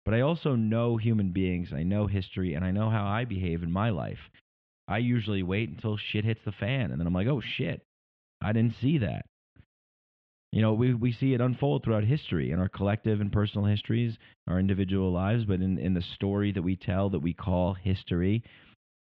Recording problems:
muffled; very; fading above 3 kHz

